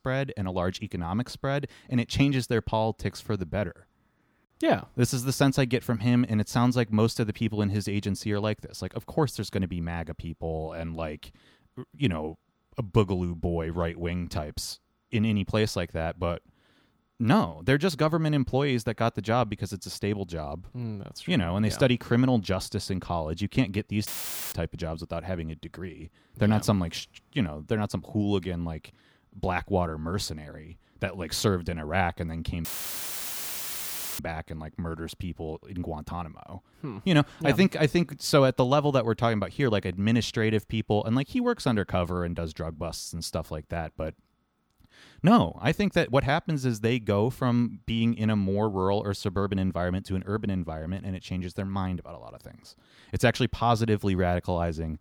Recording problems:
audio cutting out; filled with static; at 24 s and at 33 s for 1.5 s

